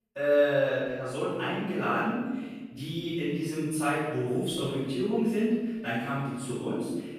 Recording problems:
room echo; strong; dies away in 1.2 s
off-mic speech; far

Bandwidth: 14 kHz